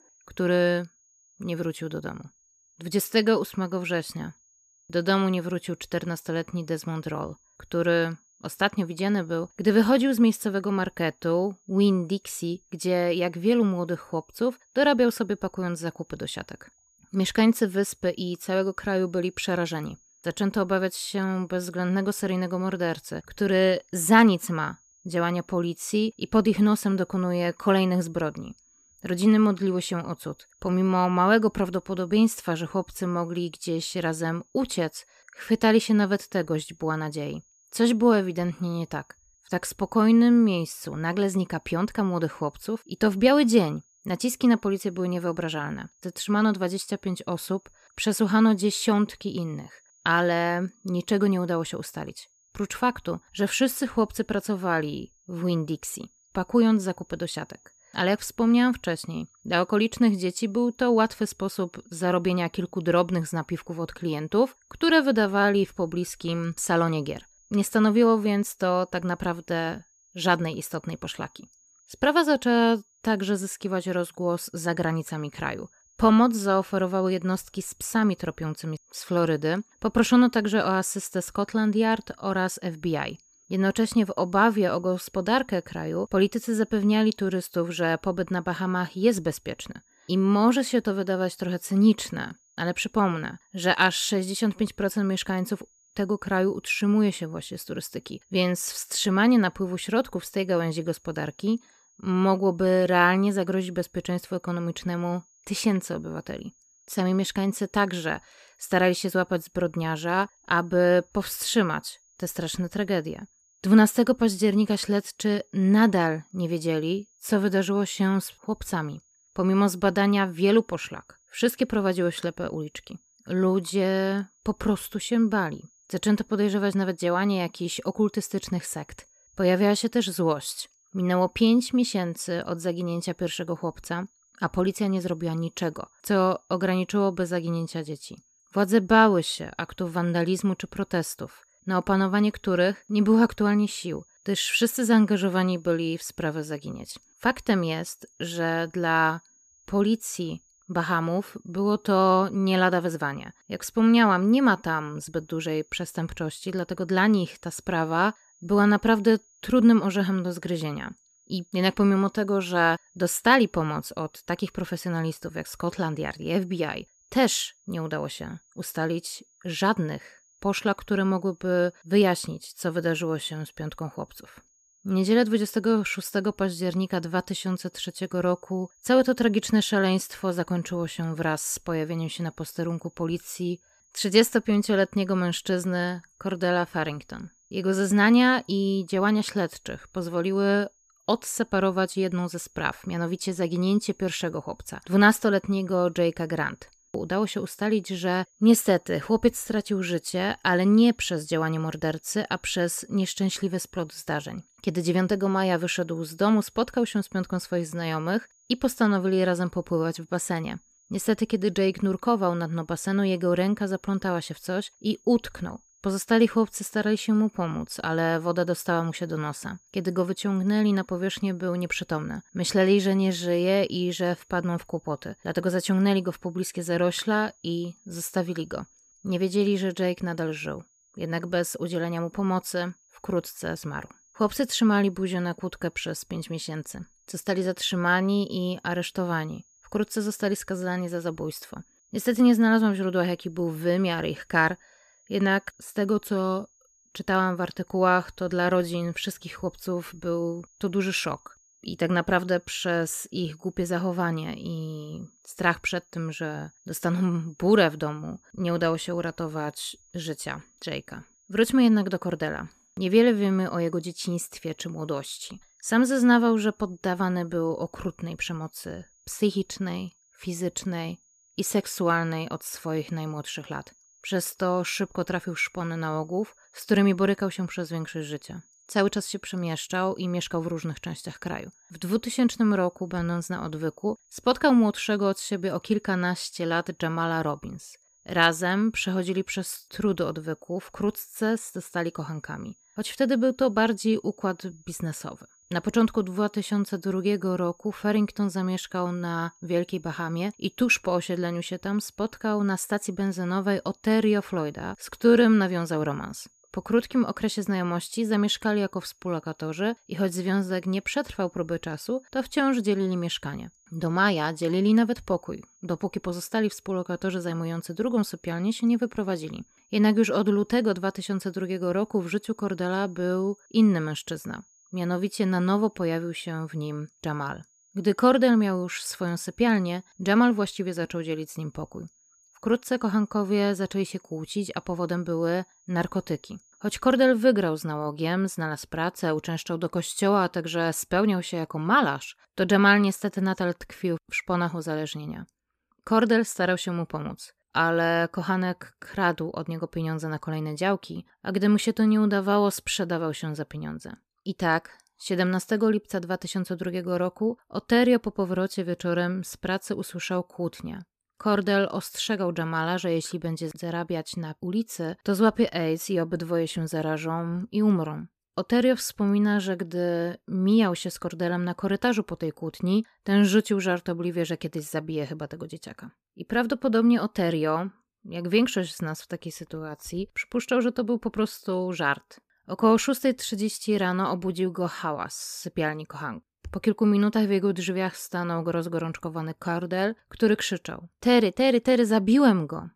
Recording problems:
high-pitched whine; faint; until 5:37; 6.5 kHz, 35 dB below the speech

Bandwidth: 14.5 kHz